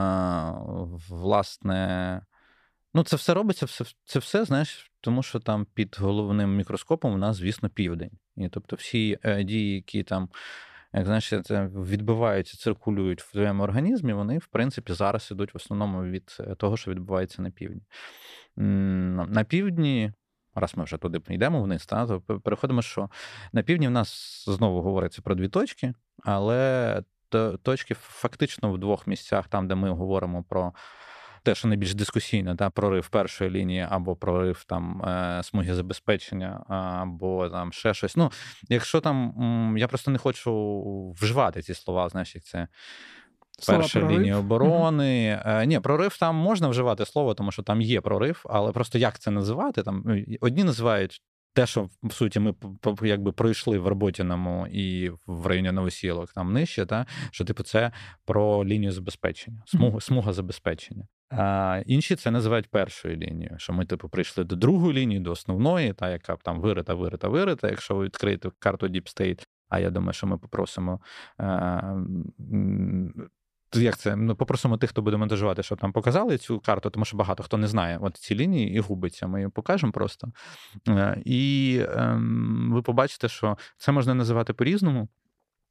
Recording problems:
abrupt cut into speech; at the start

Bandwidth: 14.5 kHz